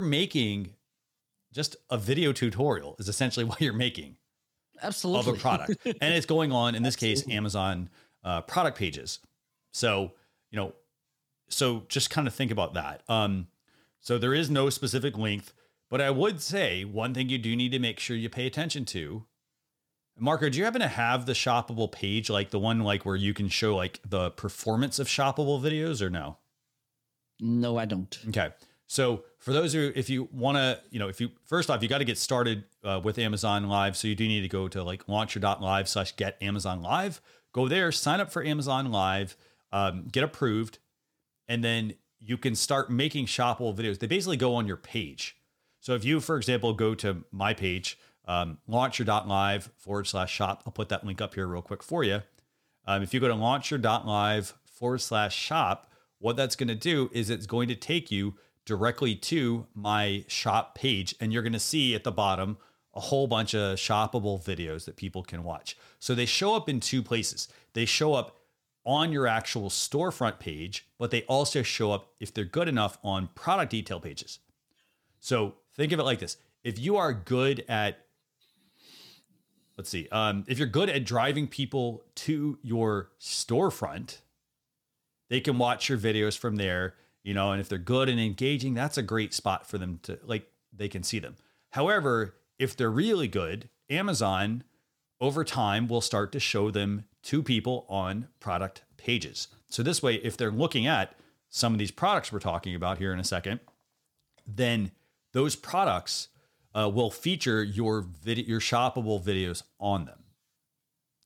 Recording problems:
abrupt cut into speech; at the start

